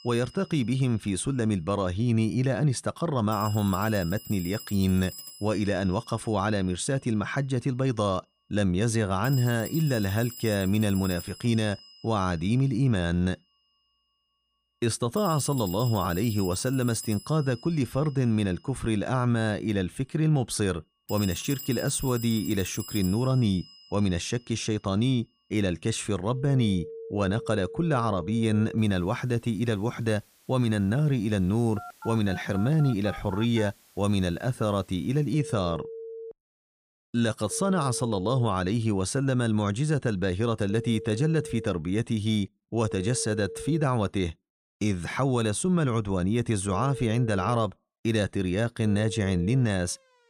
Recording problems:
alarms or sirens; noticeable; throughout; 15 dB below the speech

